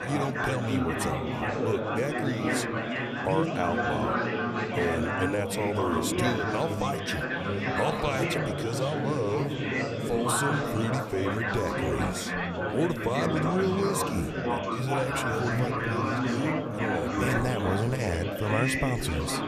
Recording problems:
chatter from many people; very loud; throughout; 2 dB above the speech

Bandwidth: 14.5 kHz